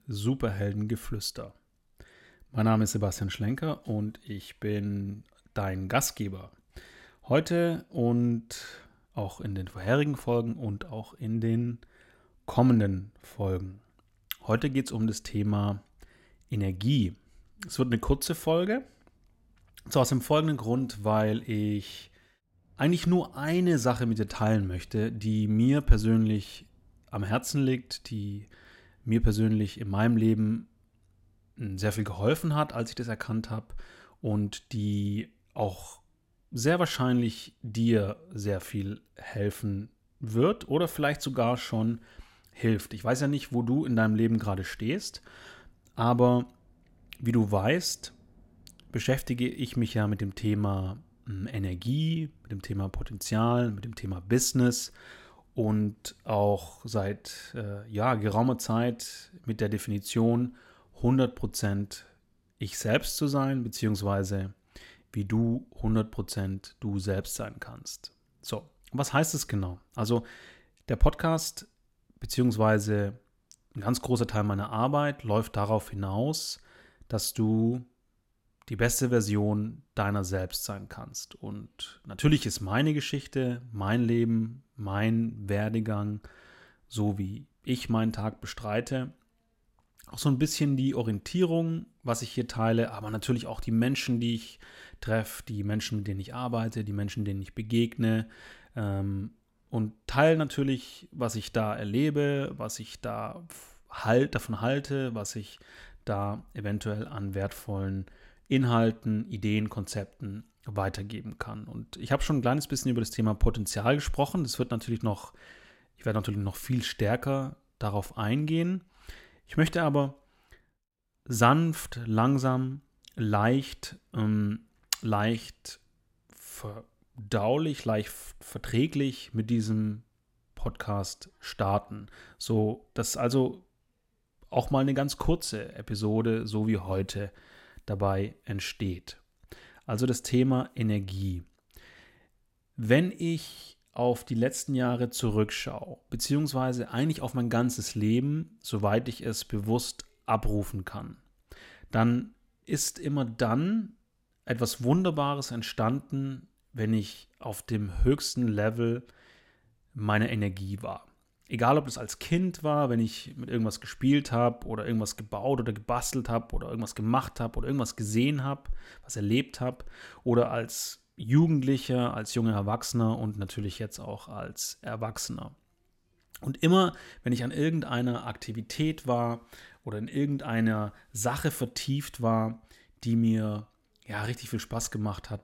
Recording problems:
none

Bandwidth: 16 kHz